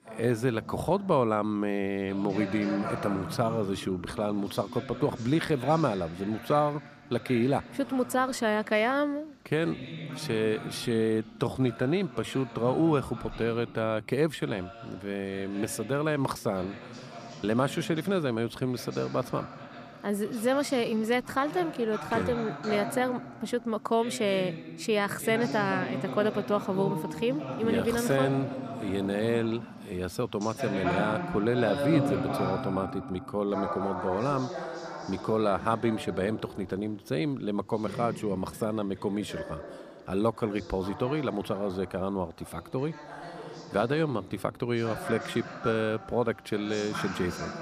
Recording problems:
voice in the background; loud; throughout; 9 dB below the speech

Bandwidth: 14.5 kHz